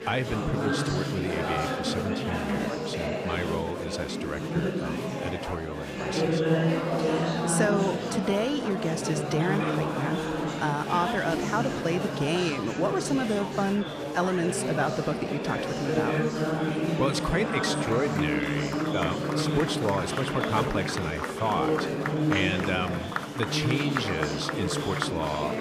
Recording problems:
murmuring crowd; very loud; throughout; 1 dB above the speech

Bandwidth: 15 kHz